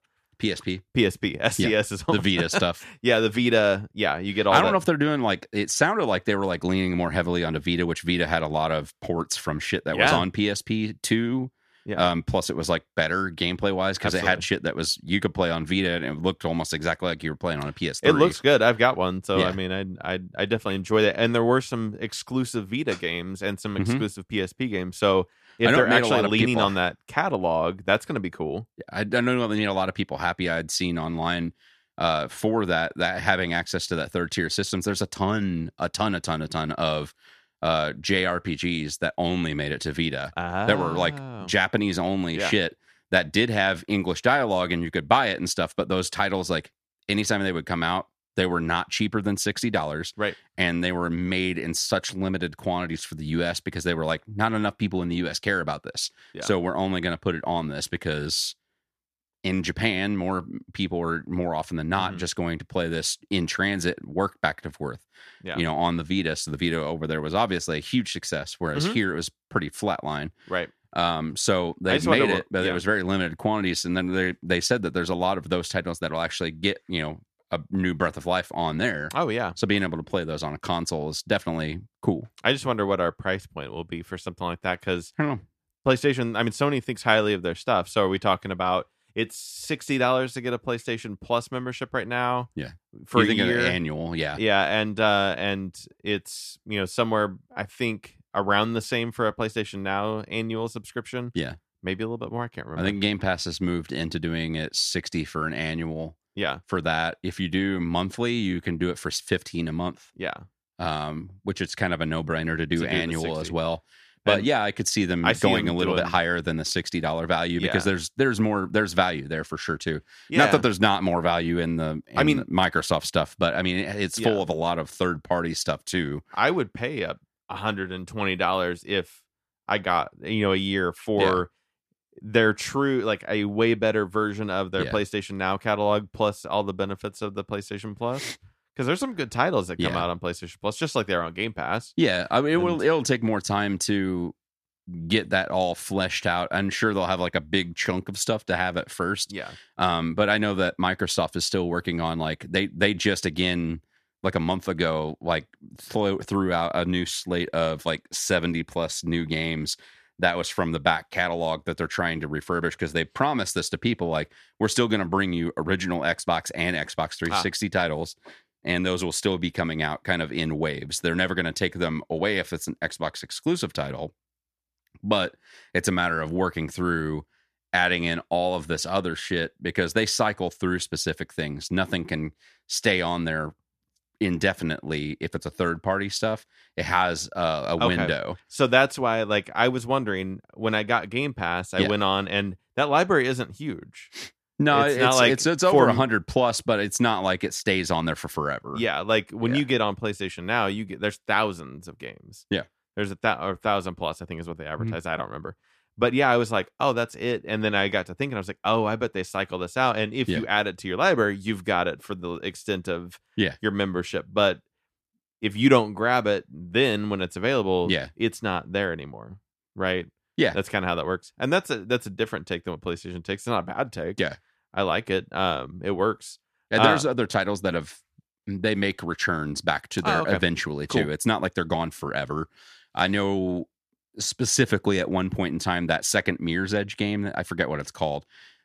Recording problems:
none

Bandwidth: 14.5 kHz